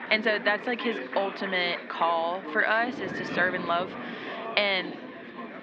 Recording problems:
muffled; slightly; fading above 3.5 kHz
thin; very slightly; fading below 250 Hz
chatter from many people; loud; throughout; 10 dB below the speech
wind noise on the microphone; occasional gusts; 20 dB below the speech

